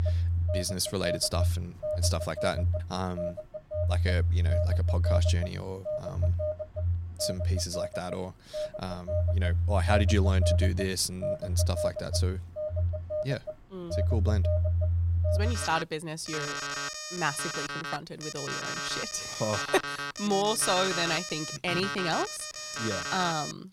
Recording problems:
alarms or sirens; very loud; throughout; 2 dB above the speech

